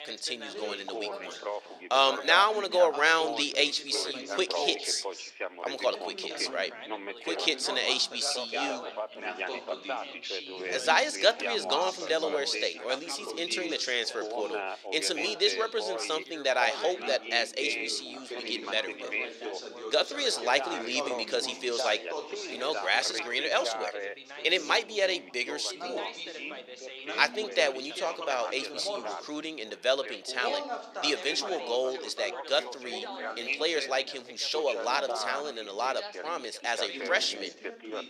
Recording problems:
thin; very; fading below 450 Hz
background chatter; loud; throughout; 3 voices, 8 dB below the speech

